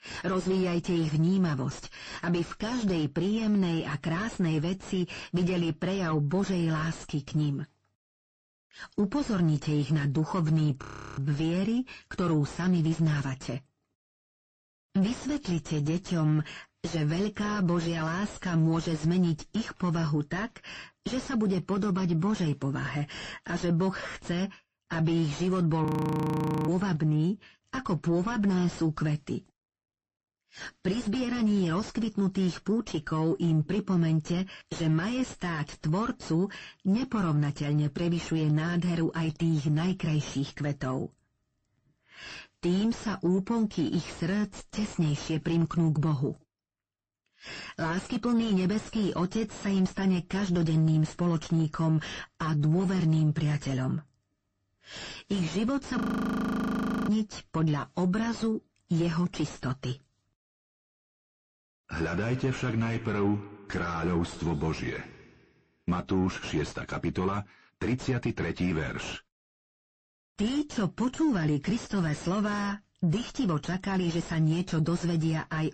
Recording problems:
distortion; heavy; 7 dB below the speech
garbled, watery; slightly; nothing above 15.5 kHz
audio freezing; at 11 s, at 26 s for 1 s and at 56 s for 1 s

